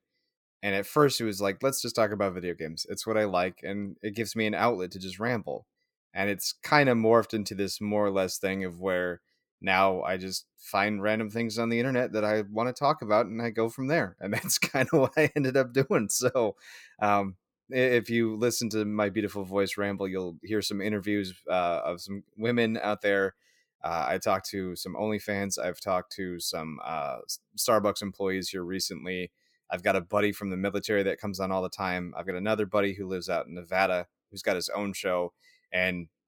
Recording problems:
none

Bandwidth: 18 kHz